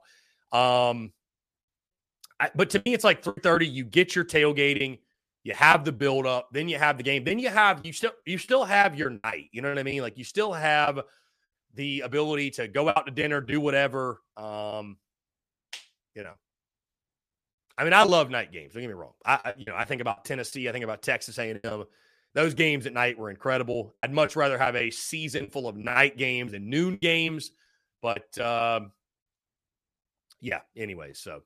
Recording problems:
choppy; very; 6% of the speech affected

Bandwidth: 14.5 kHz